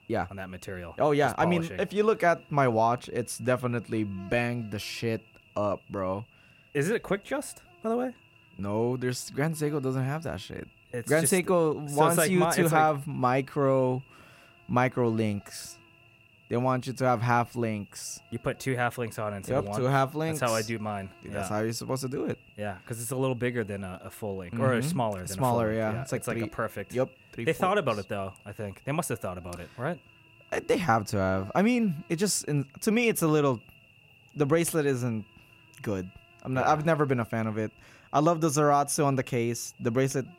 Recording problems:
electrical hum; faint; throughout; 50 Hz, 25 dB below the speech

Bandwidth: 16 kHz